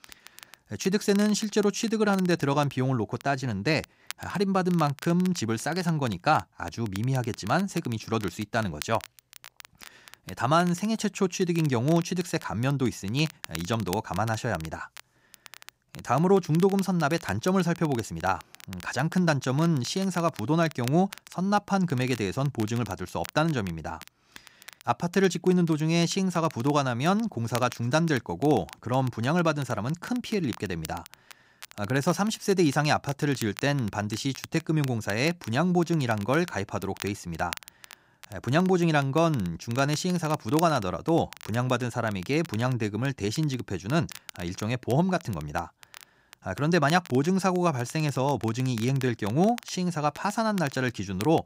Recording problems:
crackle, like an old record; noticeable; 20 dB below the speech

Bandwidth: 15.5 kHz